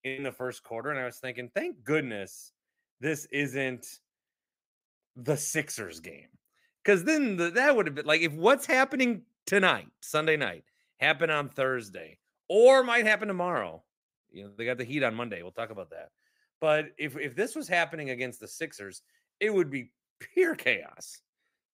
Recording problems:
none

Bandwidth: 15.5 kHz